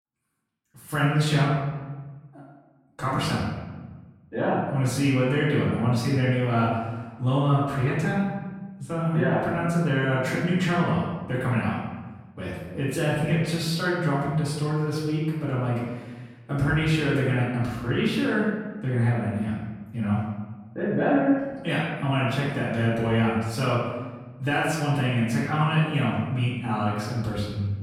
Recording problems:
off-mic speech; far
room echo; noticeable; dies away in 1.1 s

